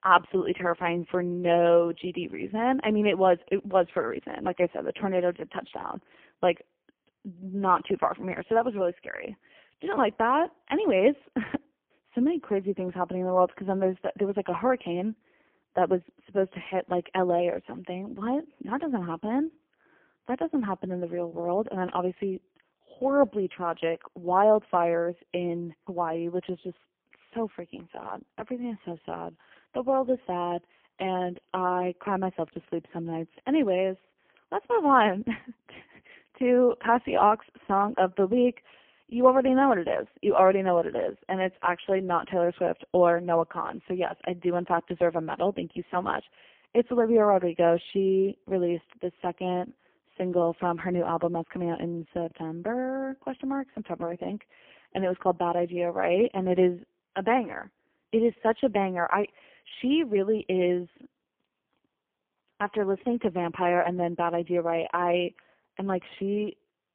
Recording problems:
phone-call audio; poor line; nothing above 3 kHz

